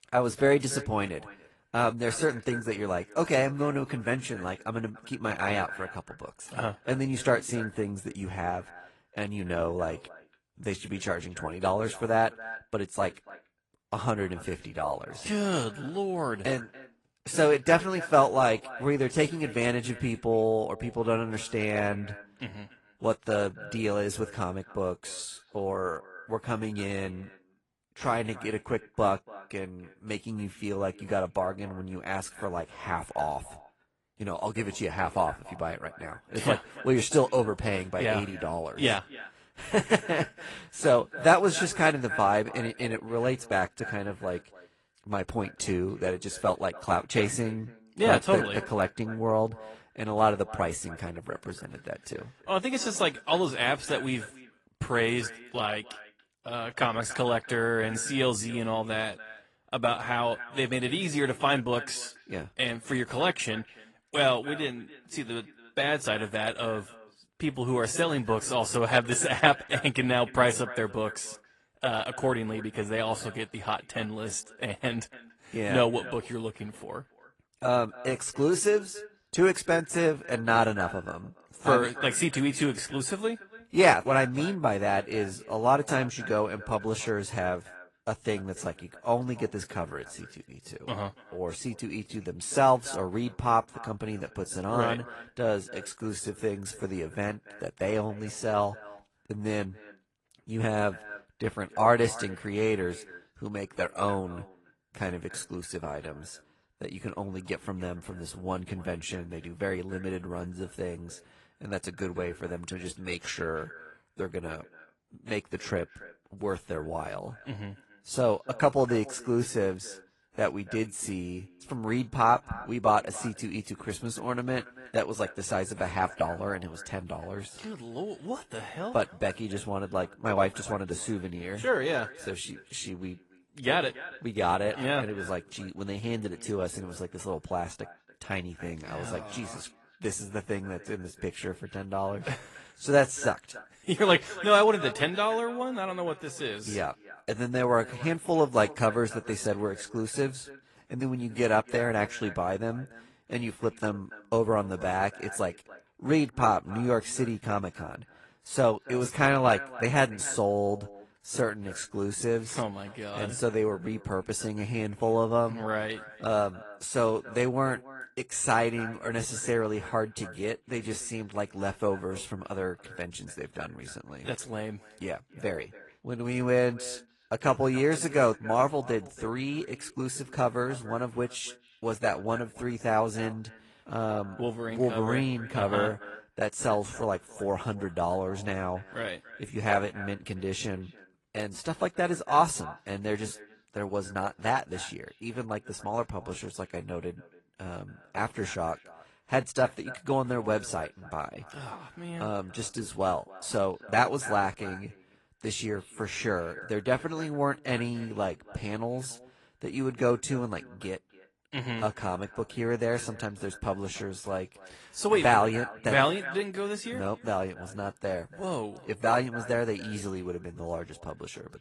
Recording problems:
echo of what is said; noticeable; throughout; 290 ms later, 15 dB below the speech
garbled, watery; slightly; nothing above 10 kHz

